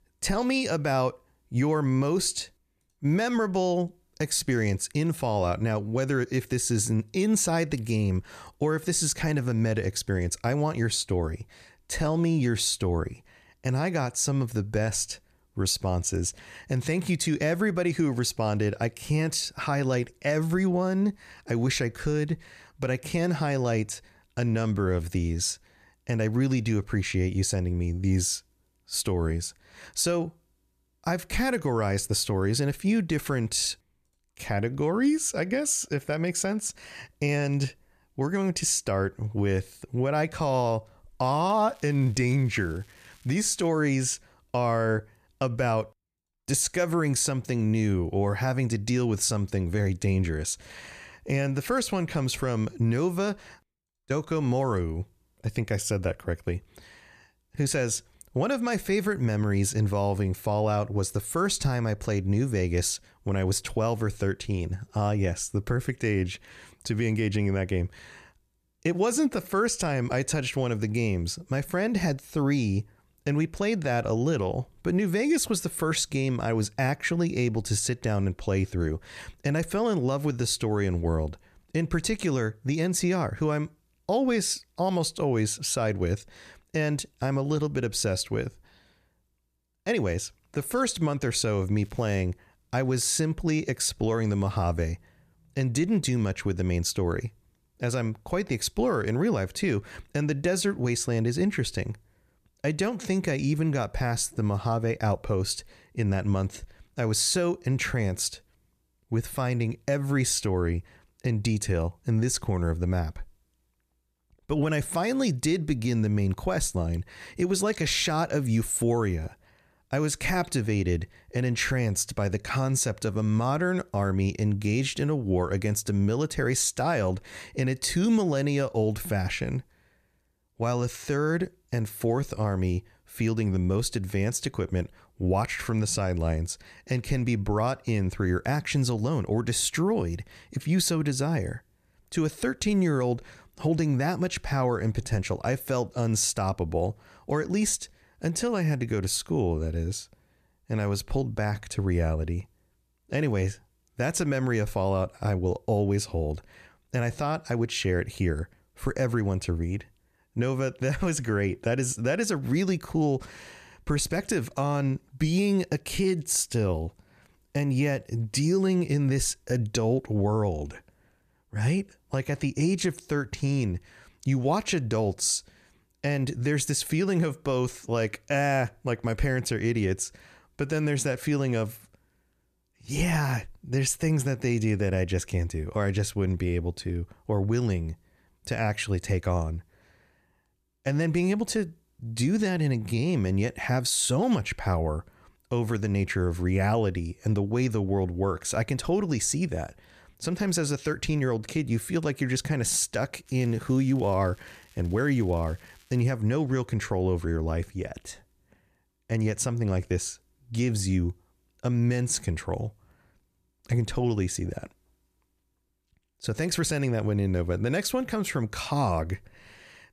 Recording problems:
crackling; faint; from 41 to 44 s, at 1:32 and from 3:23 to 3:26; 30 dB below the speech

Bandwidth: 14.5 kHz